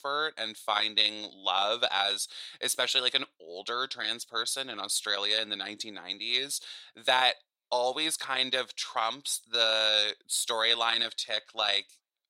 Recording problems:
thin; very; fading below 650 Hz

